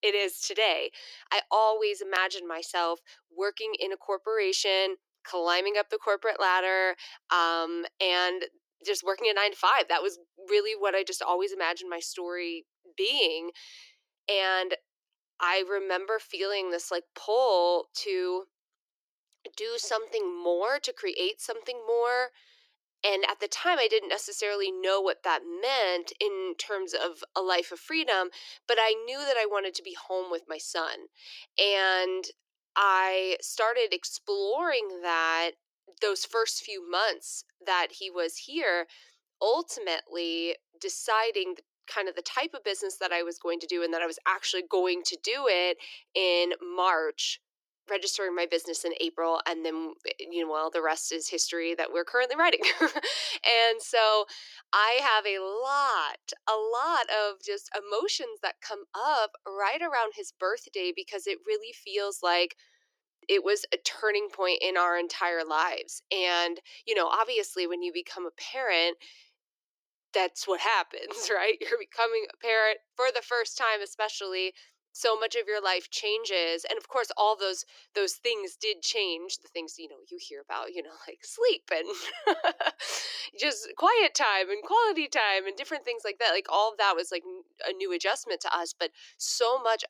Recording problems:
thin; very; fading below 350 Hz

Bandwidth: 18.5 kHz